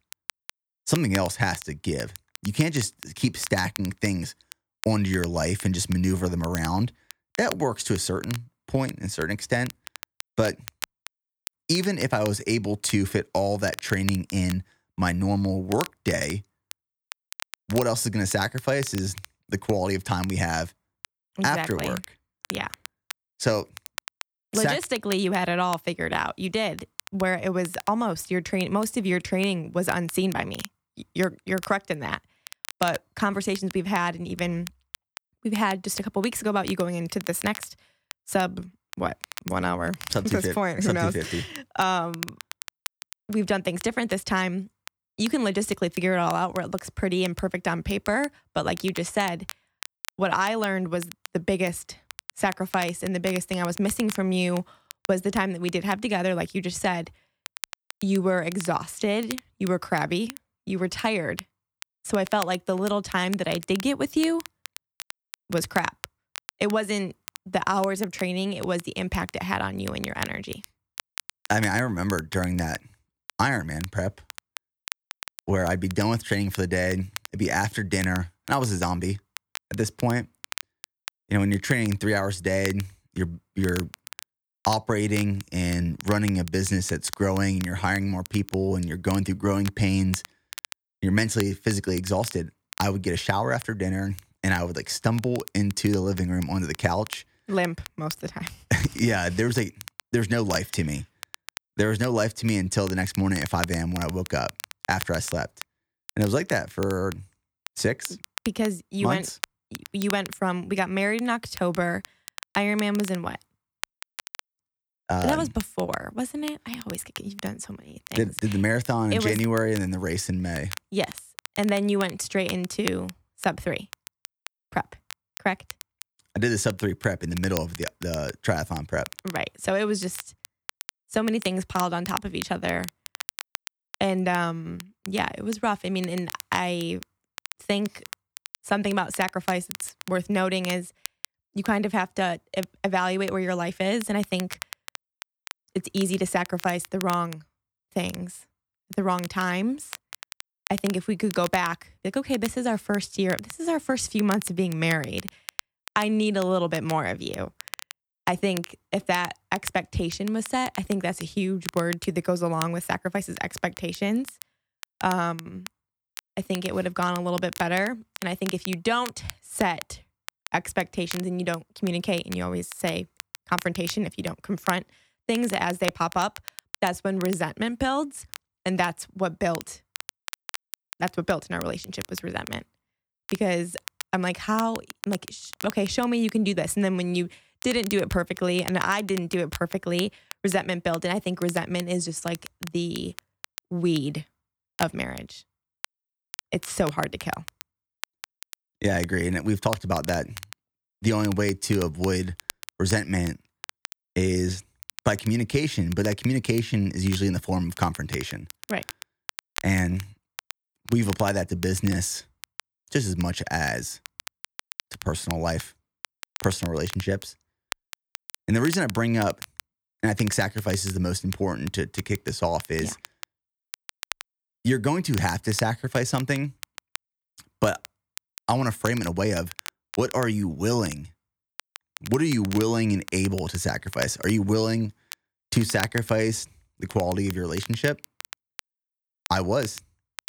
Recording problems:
crackle, like an old record; noticeable; 15 dB below the speech

